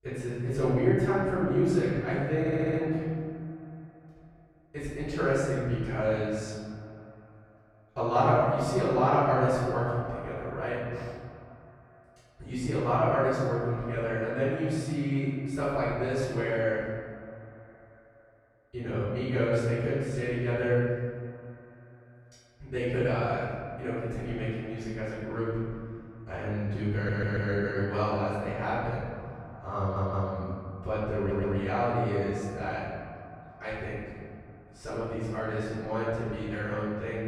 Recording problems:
room echo; strong; dies away in 1.8 s
off-mic speech; far
echo of what is said; faint; throughout; 130 ms later, 20 dB below the speech
audio stuttering; 4 times, first at 2.5 s

